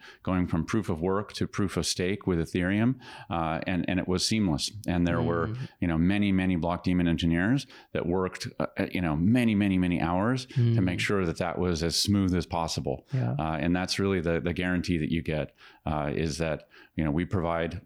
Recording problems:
none

